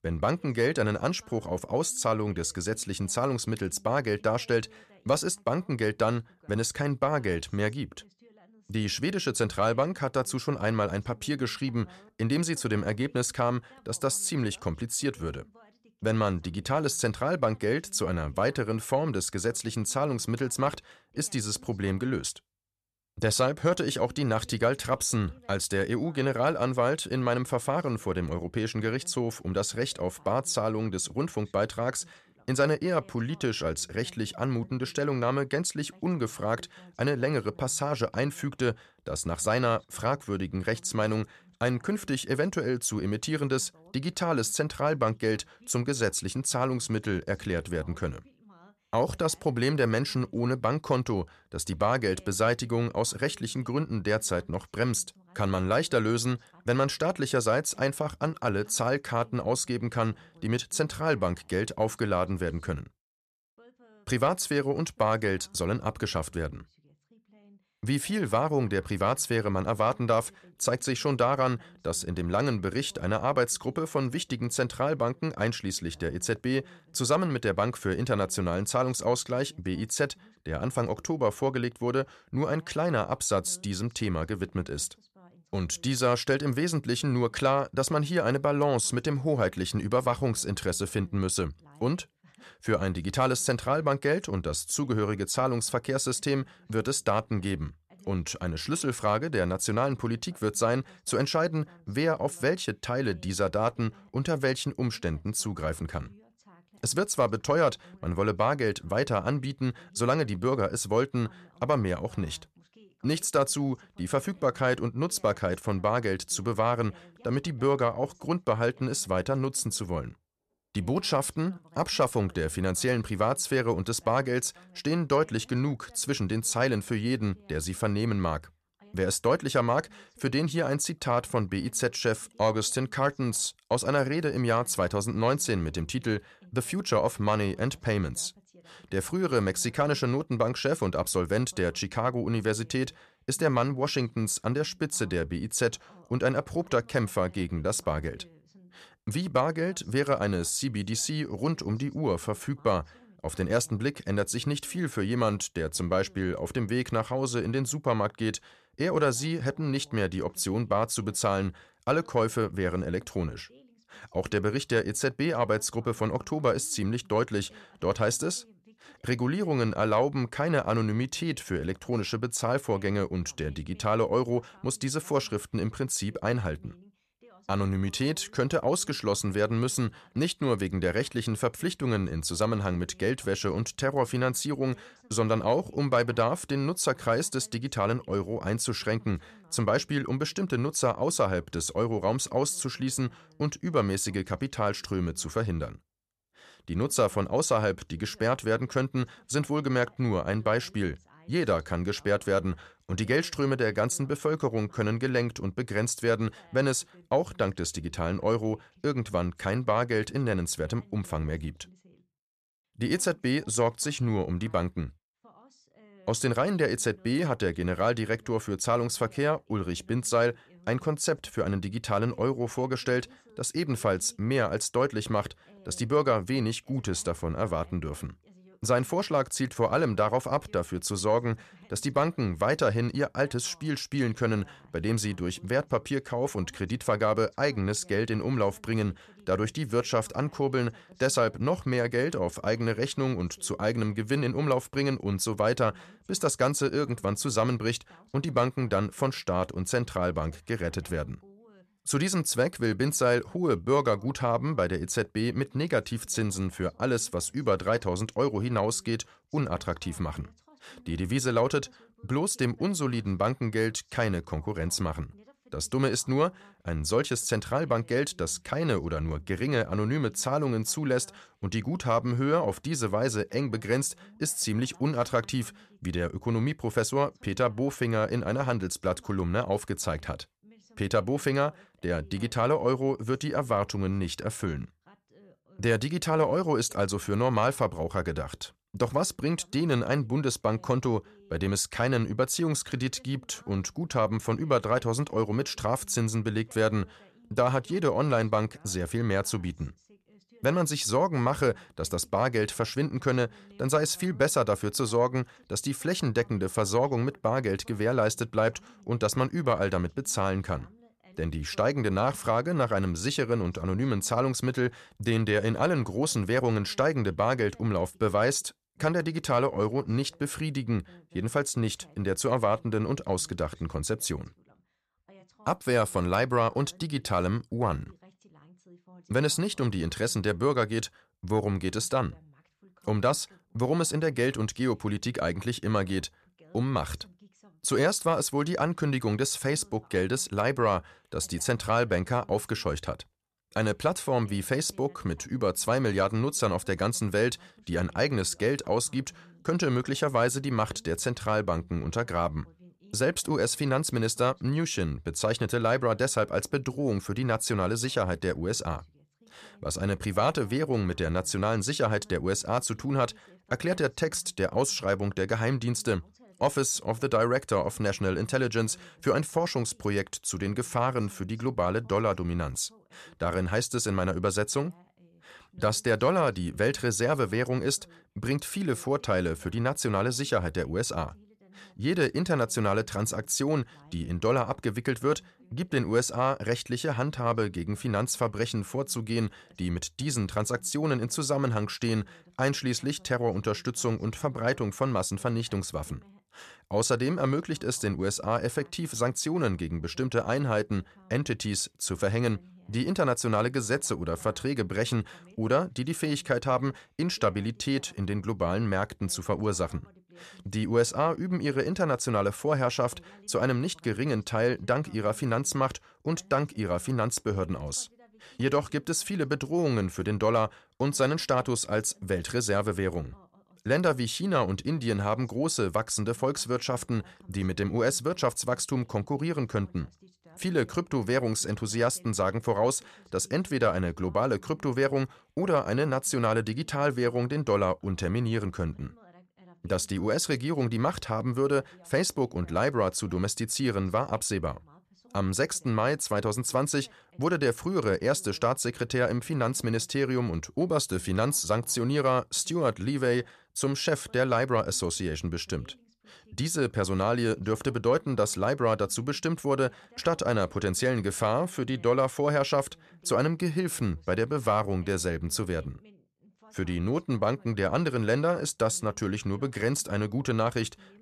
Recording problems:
voice in the background; faint; throughout; 30 dB below the speech

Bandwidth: 13.5 kHz